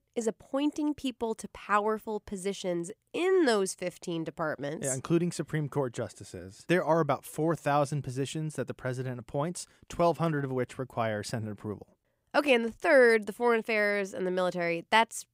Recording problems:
none

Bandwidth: 15.5 kHz